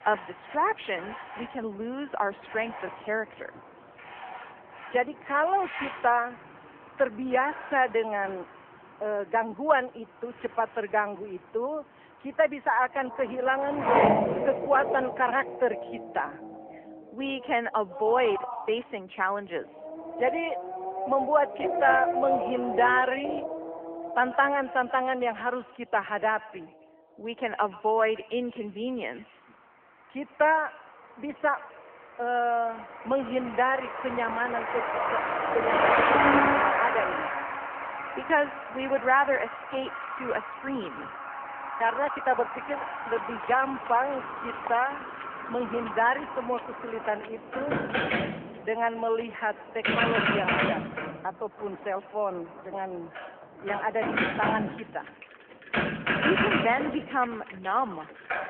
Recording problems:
echo of what is said; faint; from 24 s on; 130 ms later, 20 dB below the speech
phone-call audio; nothing above 3 kHz
traffic noise; loud; throughout; 1 dB below the speech
rain or running water; noticeable; from 43 s on; 15 dB below the speech

